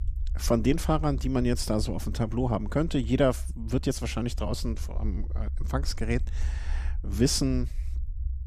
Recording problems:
low rumble; faint; throughout; 25 dB below the speech

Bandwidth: 14.5 kHz